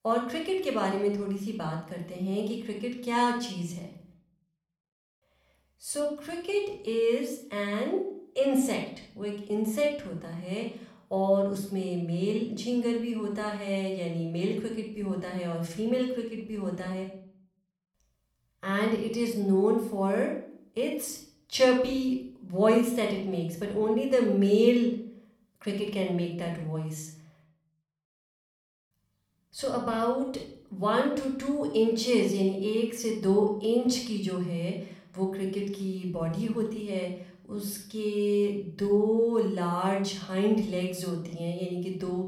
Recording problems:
room echo; noticeable; dies away in 0.6 s
off-mic speech; somewhat distant

